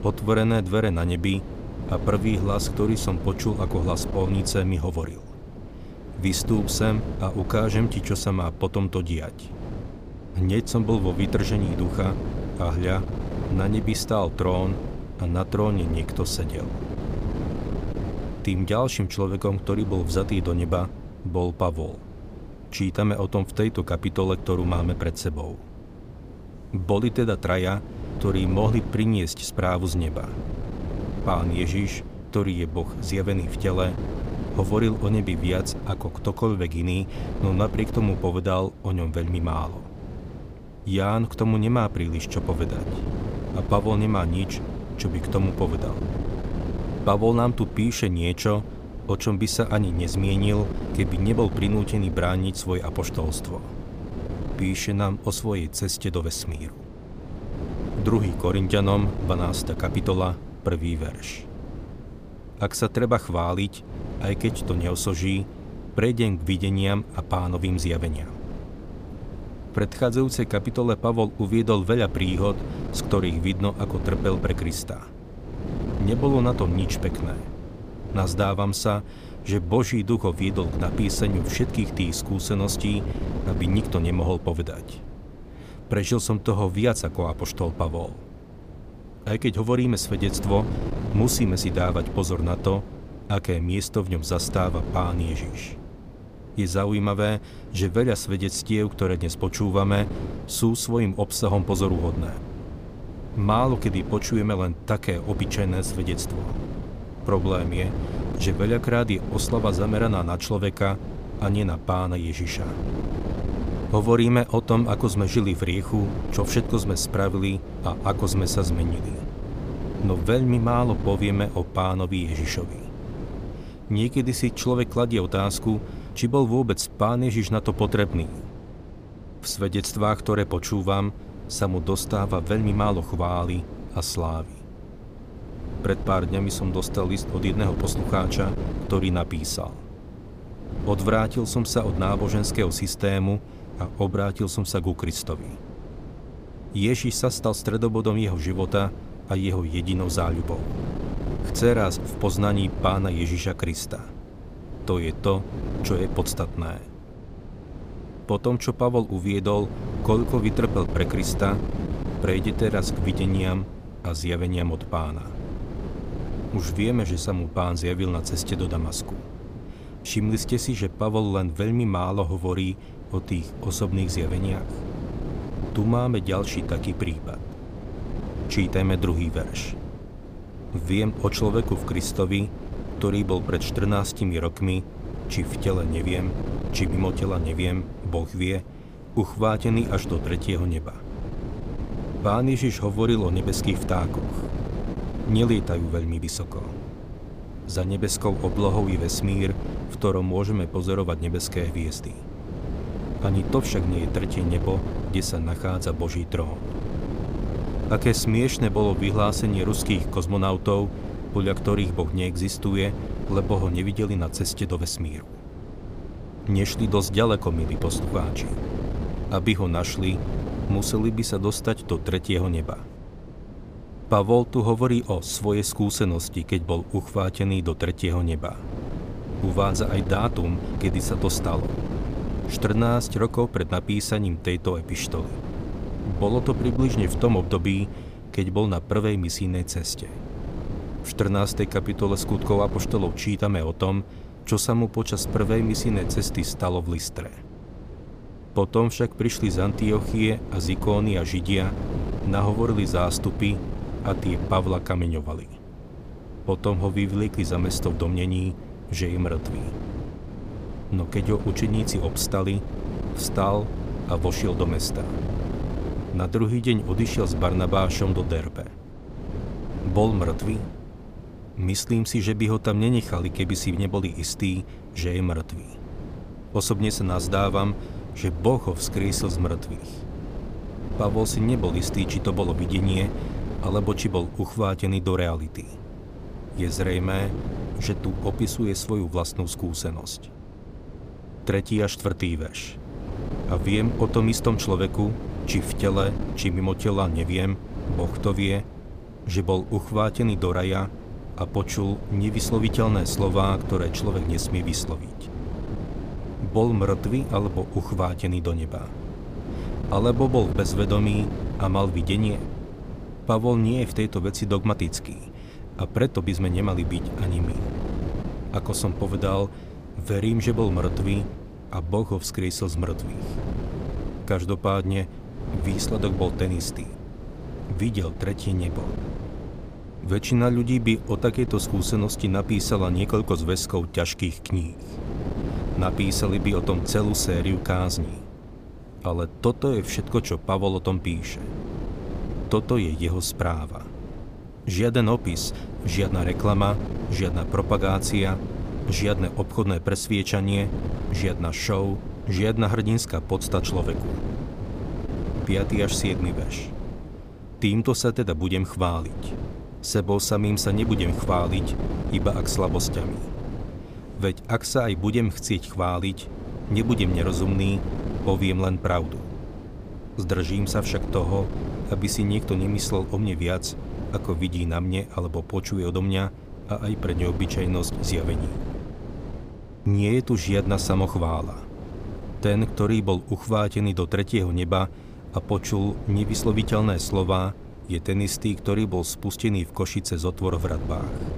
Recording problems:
wind noise on the microphone; occasional gusts; 10 dB below the speech

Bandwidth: 15 kHz